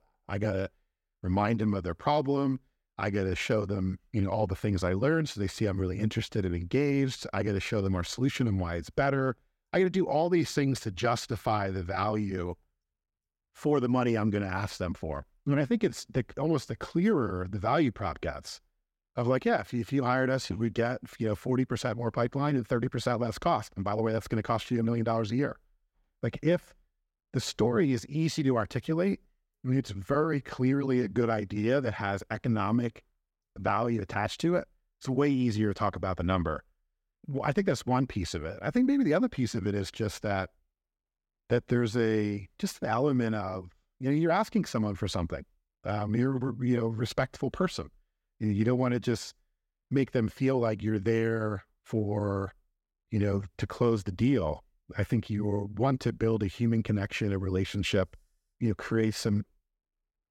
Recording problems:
none

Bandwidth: 16 kHz